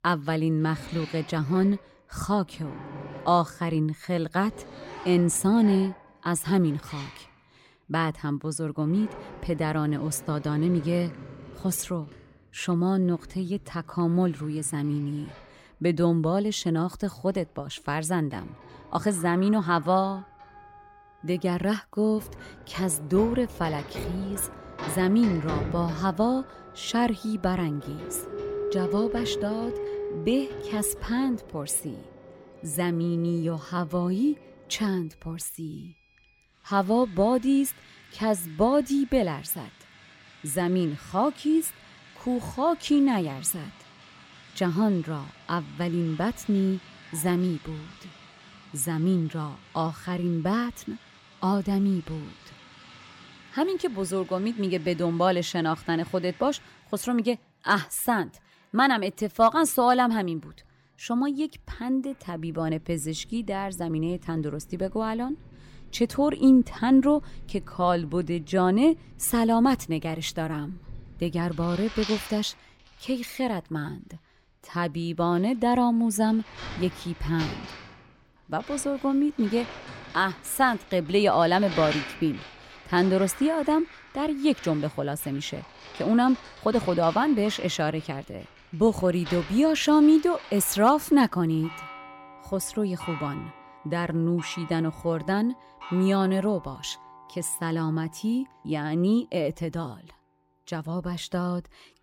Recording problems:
household noises; noticeable; throughout; 15 dB below the speech

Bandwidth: 16.5 kHz